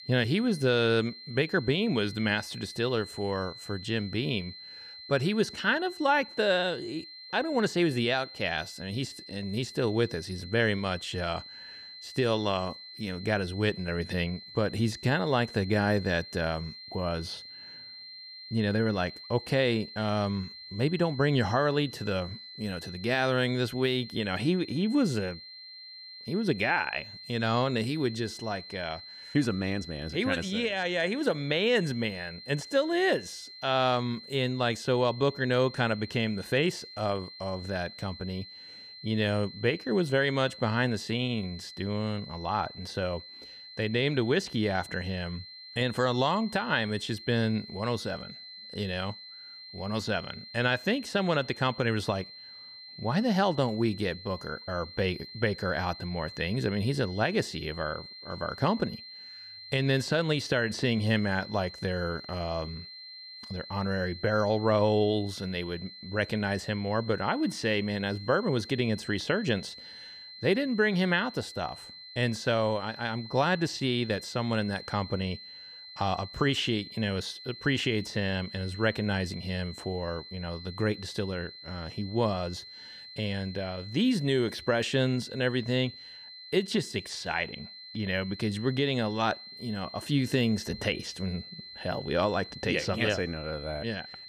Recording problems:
high-pitched whine; noticeable; throughout; 4 kHz, 15 dB below the speech

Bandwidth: 15 kHz